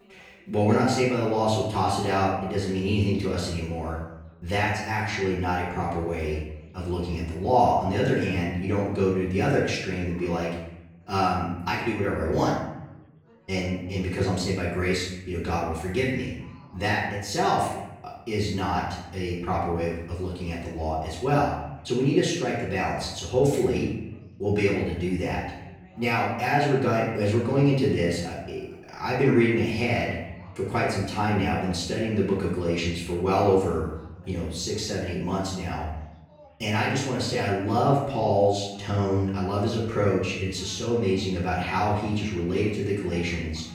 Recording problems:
off-mic speech; far
room echo; noticeable; dies away in 0.8 s
background chatter; faint; throughout; 3 voices, 30 dB below the speech

